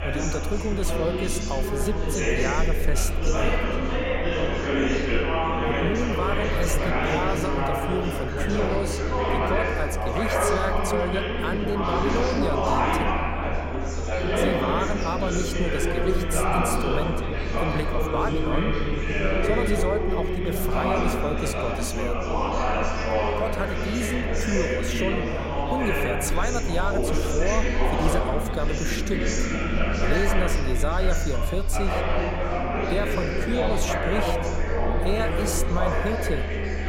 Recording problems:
chatter from many people; very loud; throughout; 3 dB above the speech
low rumble; faint; throughout; 20 dB below the speech

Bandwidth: 16 kHz